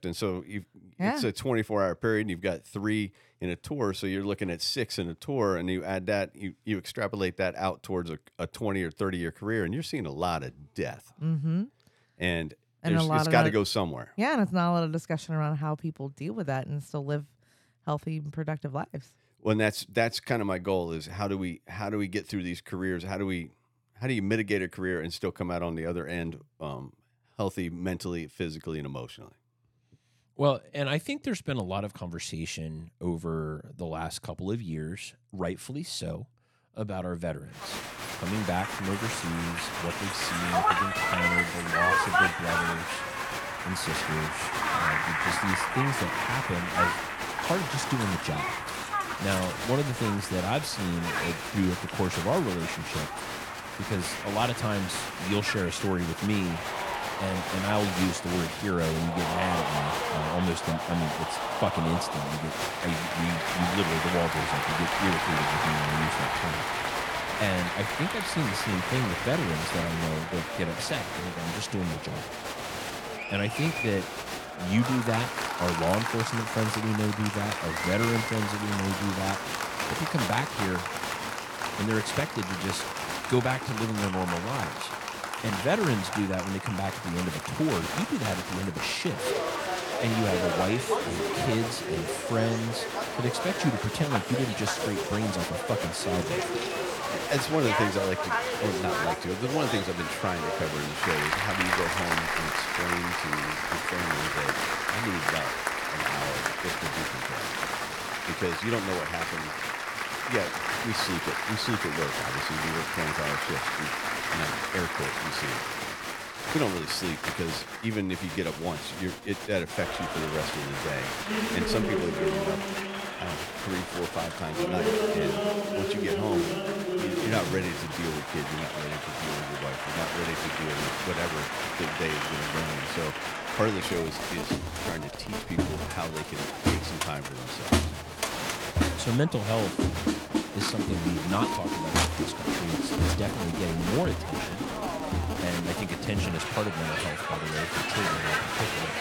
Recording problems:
crowd noise; very loud; from 38 s on; 1 dB above the speech

